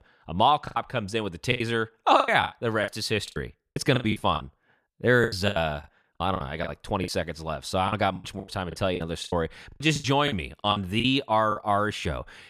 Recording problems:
choppy; very; 16% of the speech affected

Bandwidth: 14.5 kHz